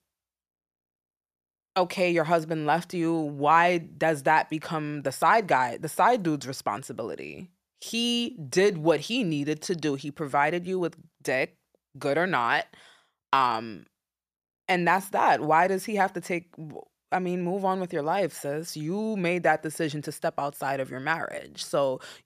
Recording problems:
none

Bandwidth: 14.5 kHz